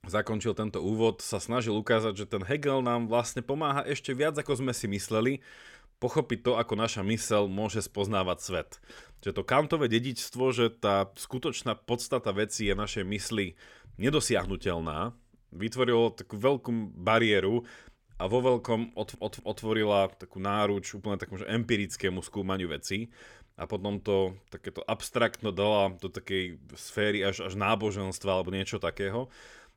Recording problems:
audio stuttering; at 19 s

